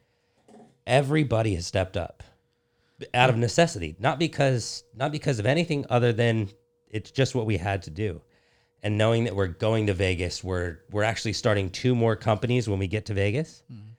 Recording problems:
none

